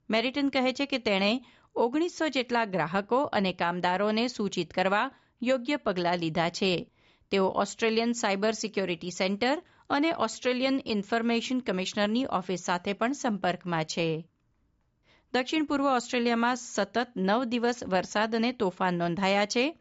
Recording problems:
high frequencies cut off; noticeable; nothing above 7.5 kHz

